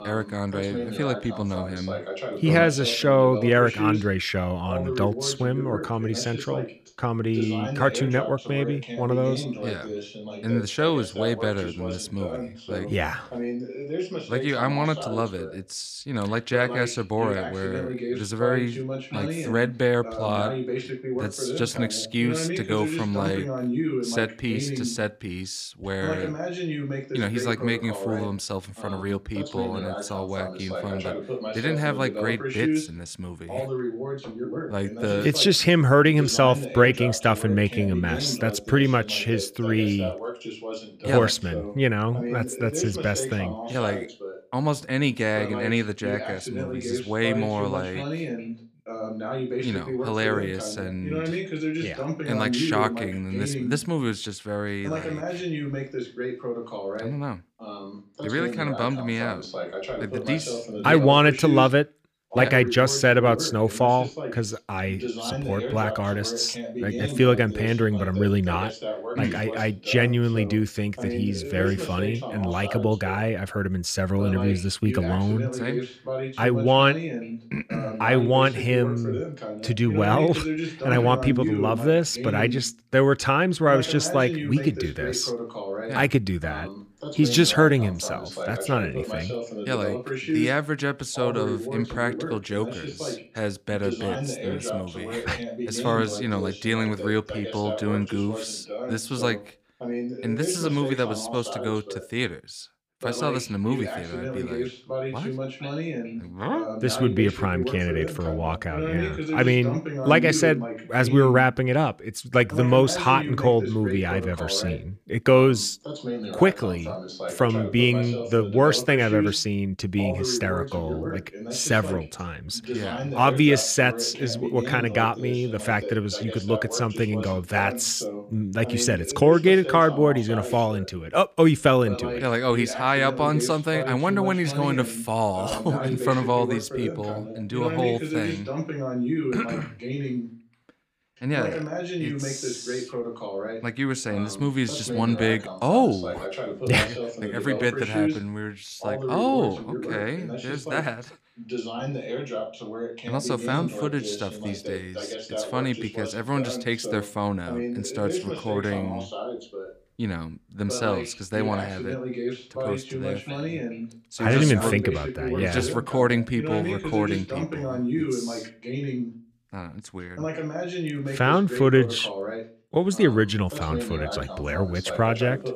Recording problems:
voice in the background; loud; throughout; 7 dB below the speech

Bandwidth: 15 kHz